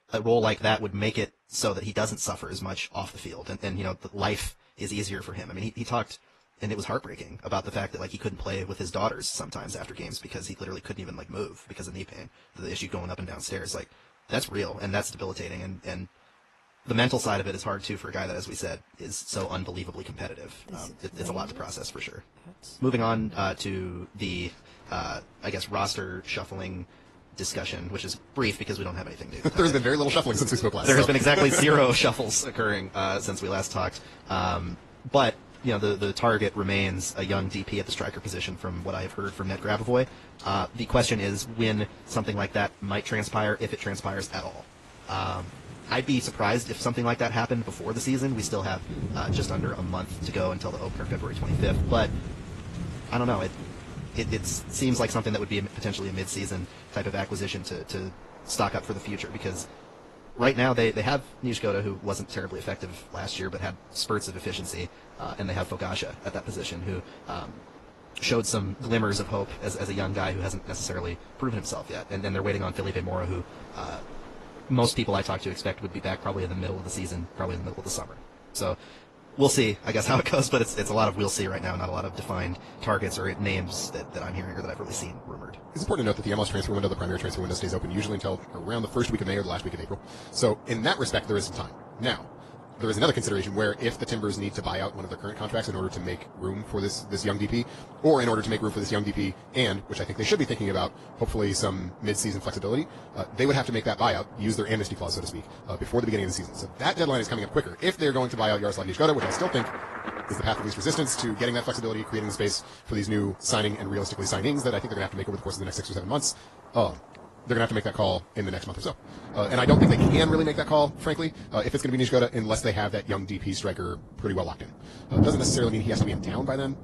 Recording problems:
wrong speed, natural pitch; too fast; 1.5 times normal speed
garbled, watery; slightly; nothing above 11.5 kHz
rain or running water; loud; throughout; 9 dB below the speech

